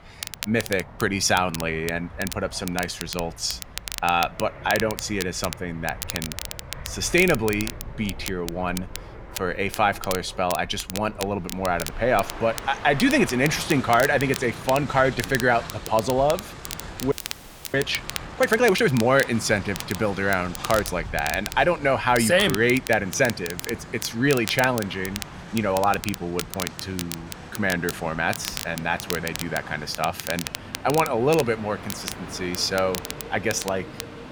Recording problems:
train or aircraft noise; noticeable; throughout; 15 dB below the speech
crackle, like an old record; noticeable; 10 dB below the speech
audio freezing; at 17 s for 0.5 s

